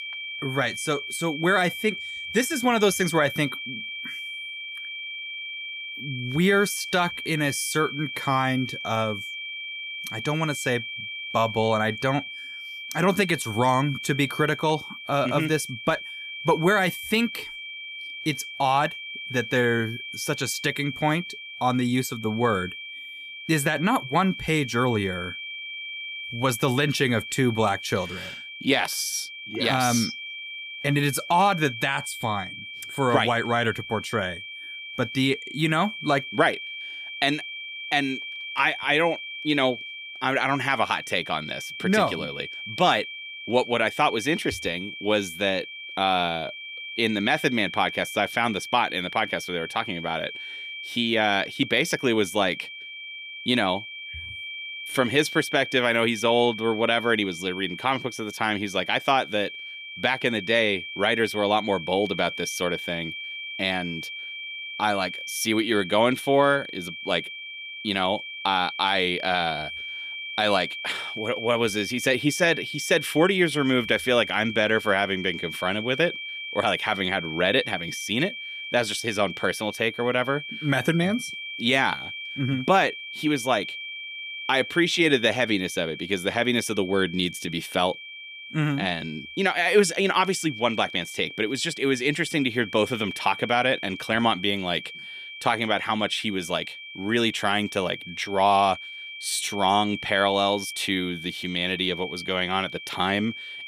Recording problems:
high-pitched whine; loud; throughout; 2.5 kHz, 9 dB below the speech

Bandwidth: 15 kHz